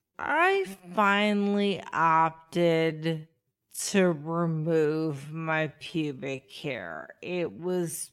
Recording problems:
wrong speed, natural pitch; too slow; 0.5 times normal speed

